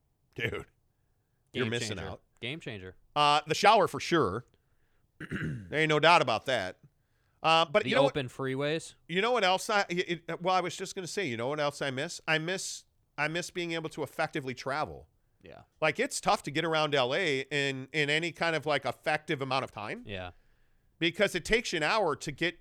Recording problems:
uneven, jittery; strongly; from 3.5 to 20 s

